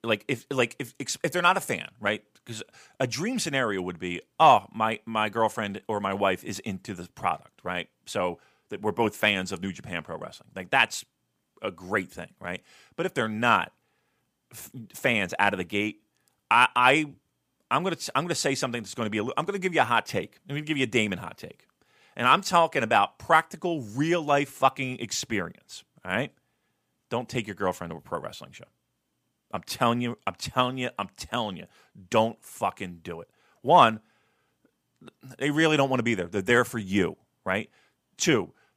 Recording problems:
none

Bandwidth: 15 kHz